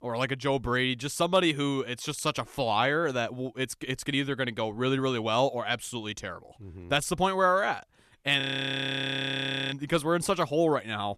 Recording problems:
audio freezing; at 8.5 s for 1.5 s

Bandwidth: 13.5 kHz